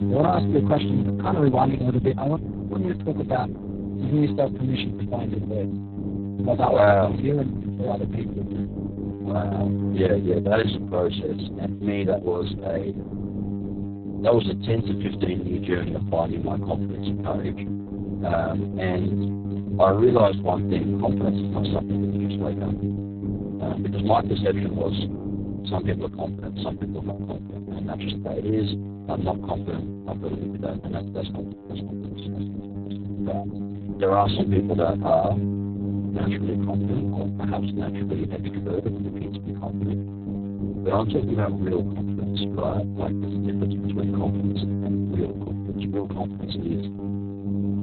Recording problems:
garbled, watery; badly; nothing above 4 kHz
electrical hum; noticeable; throughout; 50 Hz, 10 dB below the speech

